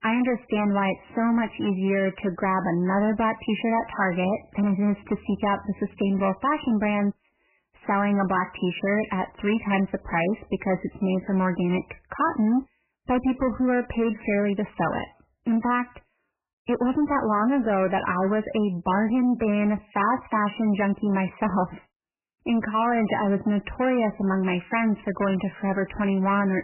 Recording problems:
garbled, watery; badly; nothing above 3 kHz
distortion; slight; 10 dB below the speech

